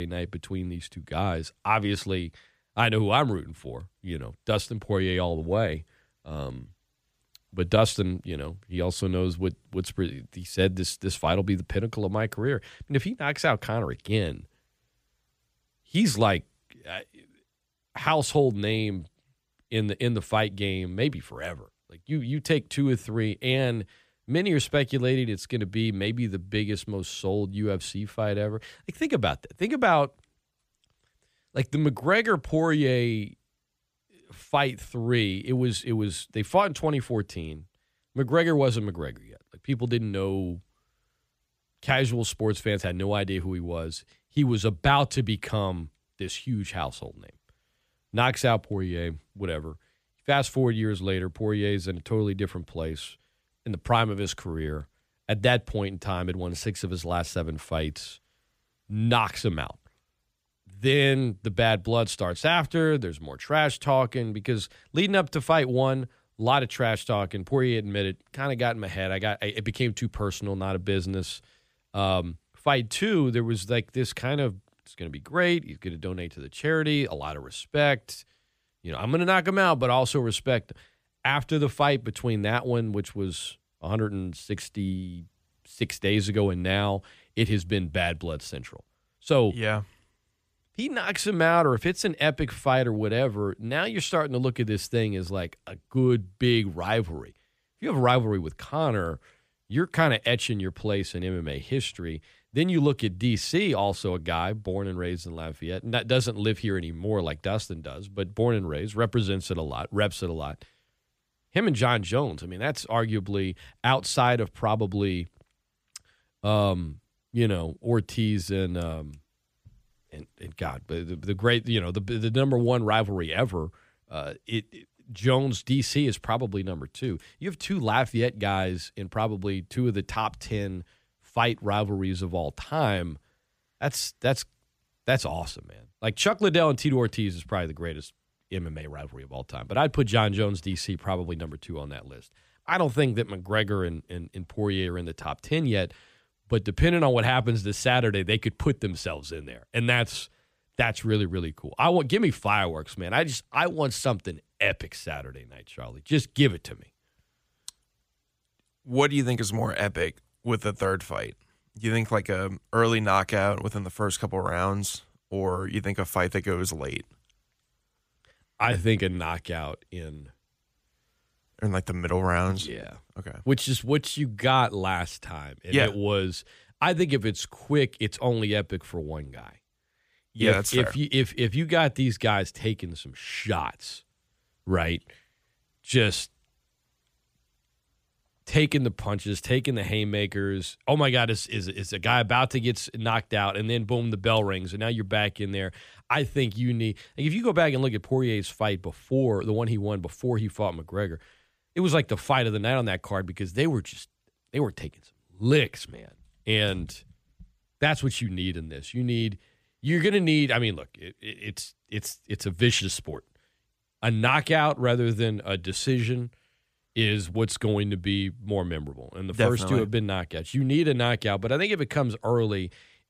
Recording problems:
abrupt cut into speech; at the start

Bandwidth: 15 kHz